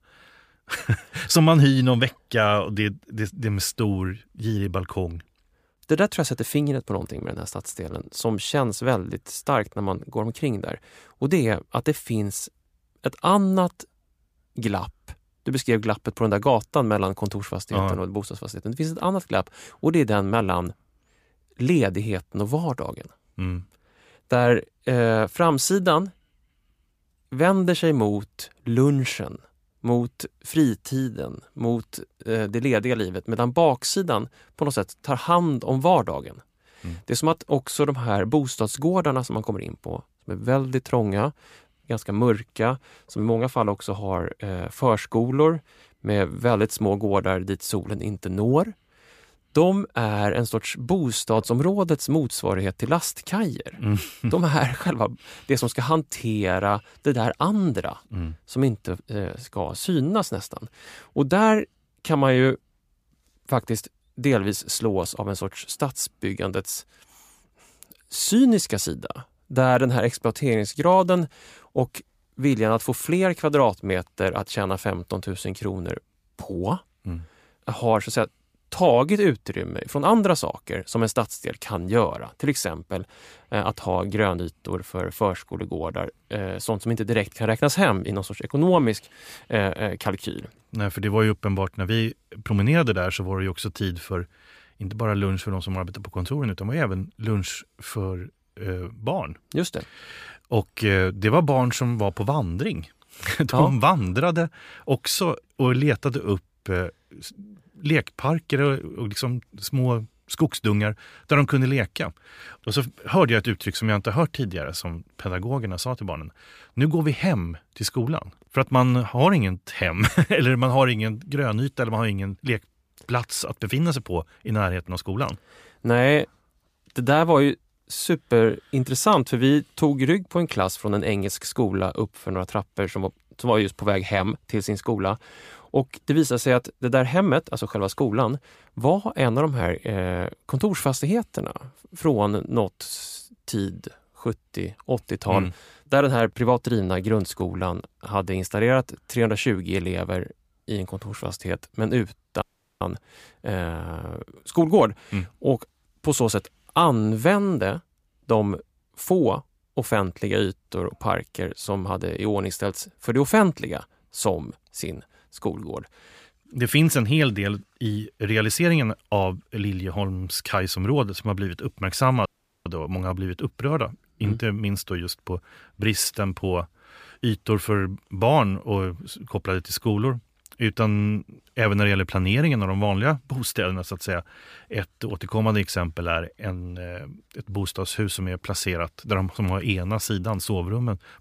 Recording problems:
audio cutting out; at 2:32 and at 2:52

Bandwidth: 15 kHz